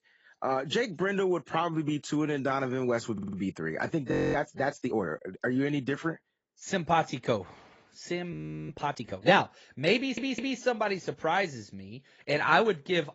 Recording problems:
garbled, watery; badly; nothing above 7.5 kHz
audio stuttering; at 3 s and at 10 s
audio freezing; at 4 s and at 8.5 s

